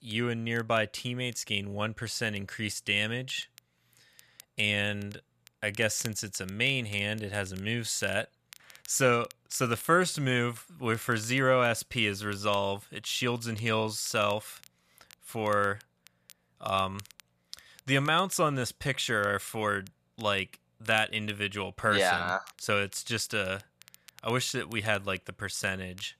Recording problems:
crackle, like an old record; faint; 25 dB below the speech

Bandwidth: 14.5 kHz